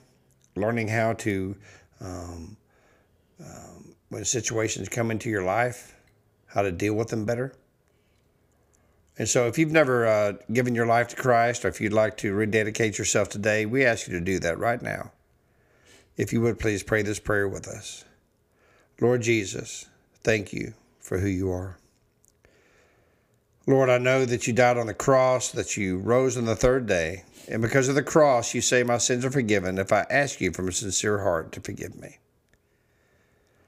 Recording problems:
none

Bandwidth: 15 kHz